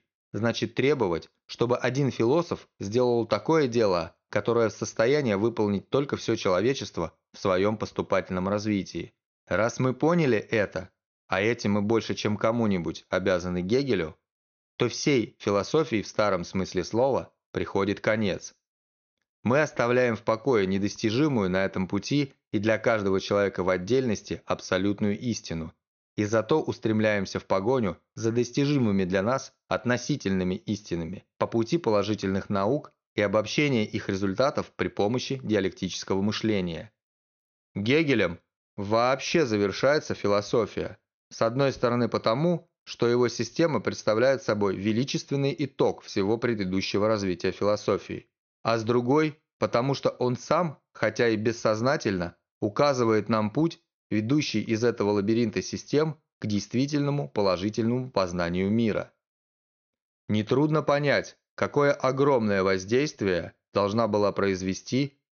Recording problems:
high frequencies cut off; noticeable; nothing above 6.5 kHz

